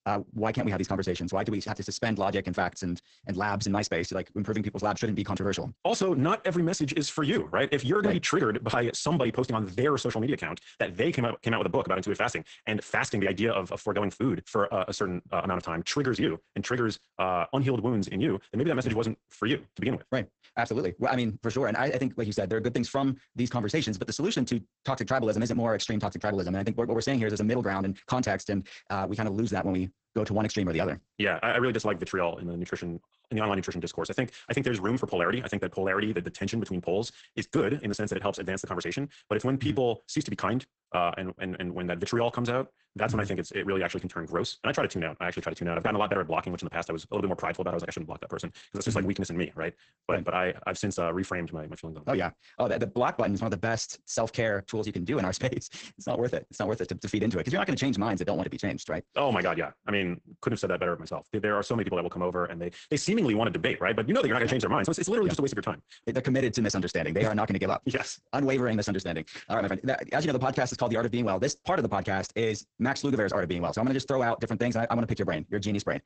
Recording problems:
garbled, watery; badly; nothing above 8 kHz
wrong speed, natural pitch; too fast; 1.7 times normal speed

